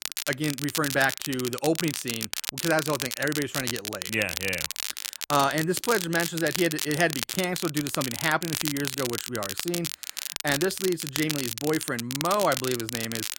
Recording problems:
crackle, like an old record; loud; 4 dB below the speech

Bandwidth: 16.5 kHz